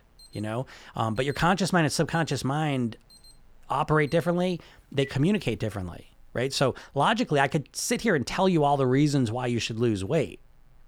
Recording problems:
alarms or sirens; faint; until 6 s; 25 dB below the speech

